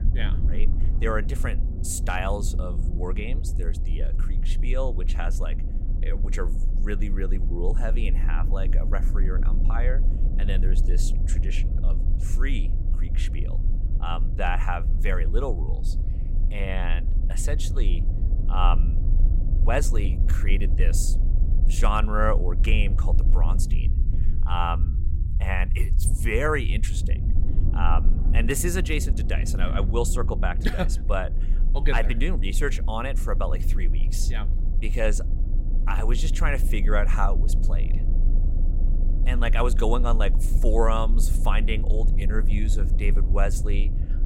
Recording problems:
low rumble; noticeable; throughout; 15 dB below the speech

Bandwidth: 16 kHz